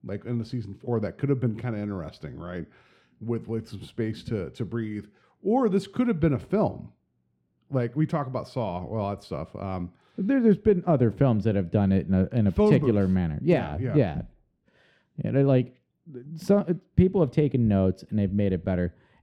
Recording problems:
muffled; very; fading above 1 kHz

